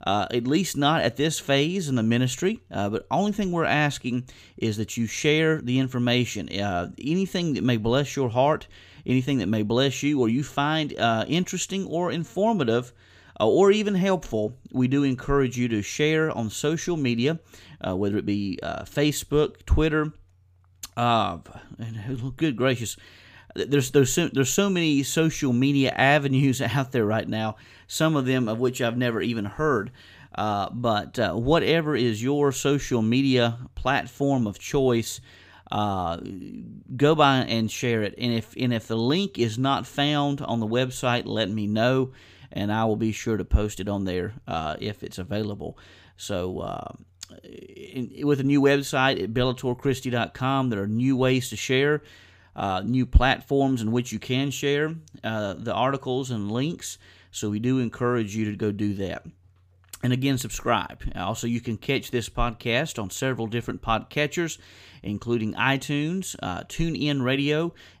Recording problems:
none

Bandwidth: 15 kHz